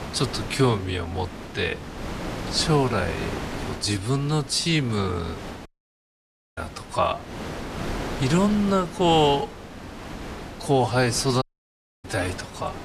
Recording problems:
wrong speed, natural pitch; too slow; 0.6 times normal speed
wind noise on the microphone; occasional gusts; 10 dB below the speech
audio cutting out; at 5.5 s for 1 s and at 11 s for 0.5 s

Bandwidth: 14.5 kHz